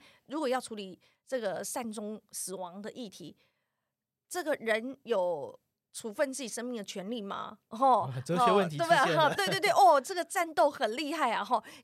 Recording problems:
none

